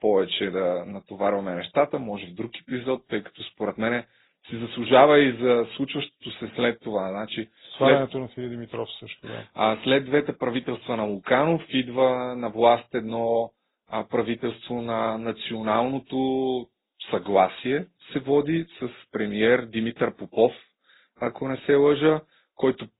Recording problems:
garbled, watery; badly
high frequencies cut off; severe; nothing above 4 kHz

